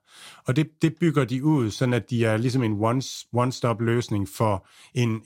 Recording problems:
none

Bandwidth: 16 kHz